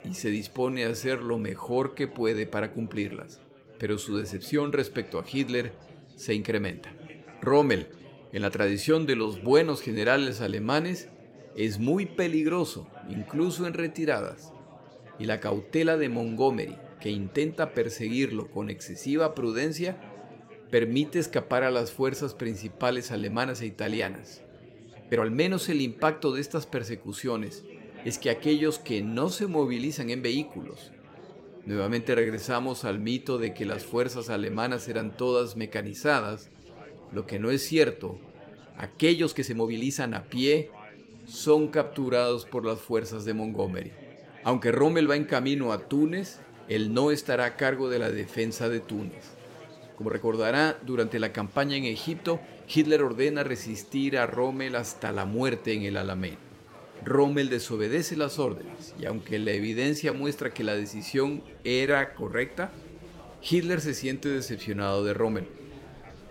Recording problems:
chatter from many people; noticeable; throughout; 20 dB below the speech
uneven, jittery; strongly; from 0.5 s to 1:02

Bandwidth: 16 kHz